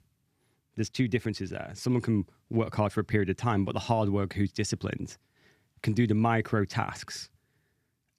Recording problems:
none

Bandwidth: 14.5 kHz